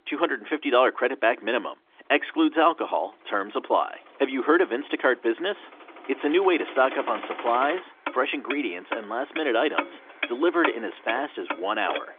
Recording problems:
phone-call audio; nothing above 3.5 kHz
traffic noise; loud; throughout; 9 dB below the speech

